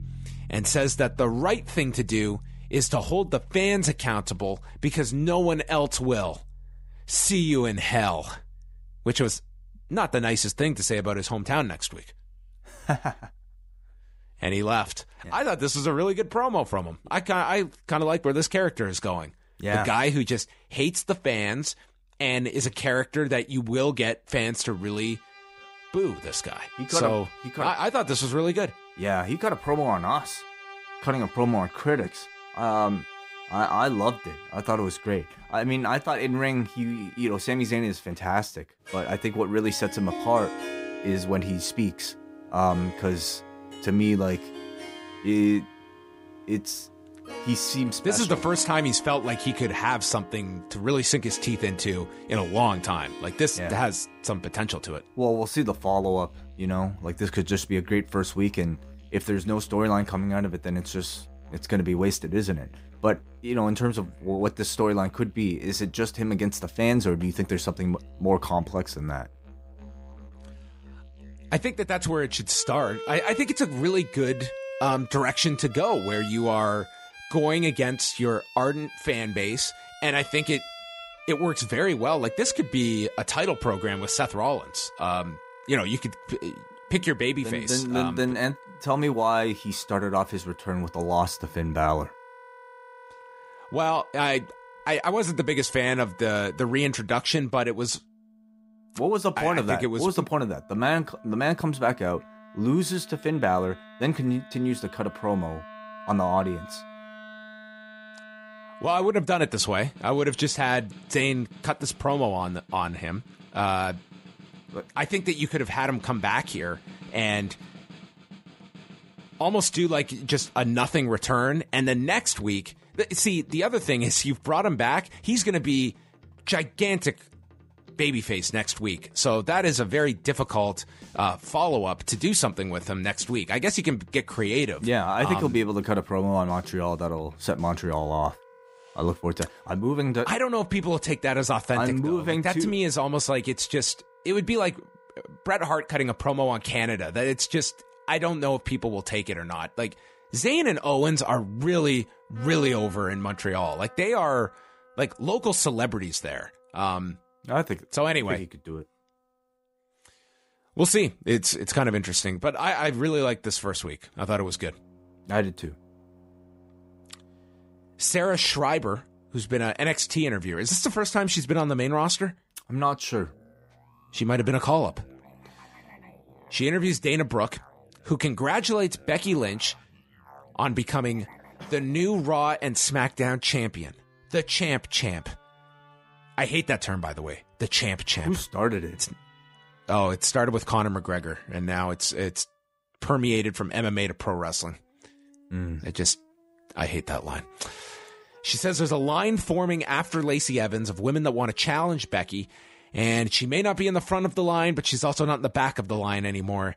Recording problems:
background music; noticeable; throughout; 20 dB below the speech

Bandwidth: 15.5 kHz